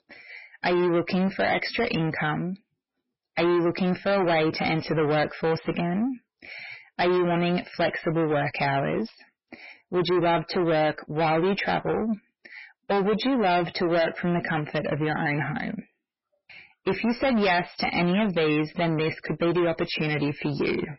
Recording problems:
distortion; heavy; 6 dB below the speech
garbled, watery; badly; nothing above 5.5 kHz

